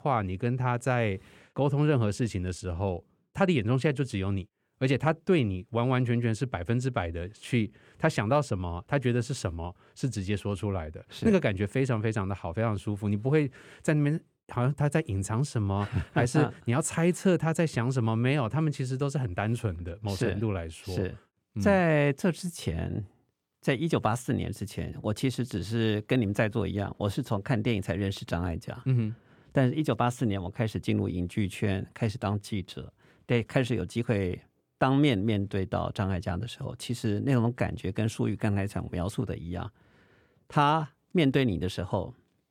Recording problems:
none

